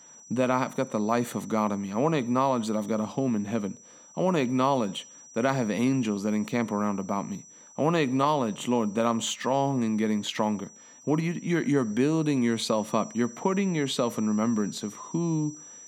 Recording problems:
high-pitched whine; noticeable; throughout; 6 kHz, 20 dB below the speech

